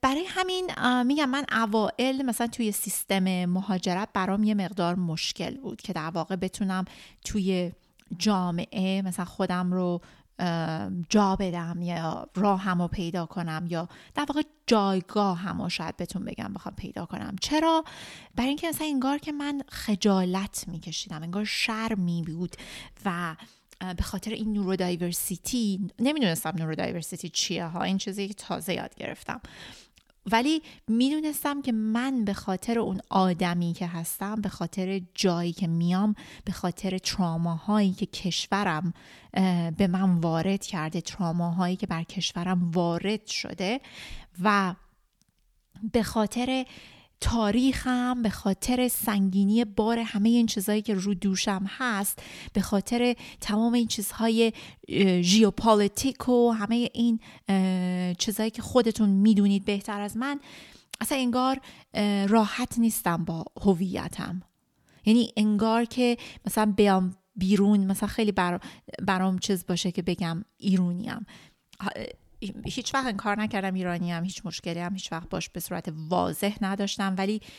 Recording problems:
none

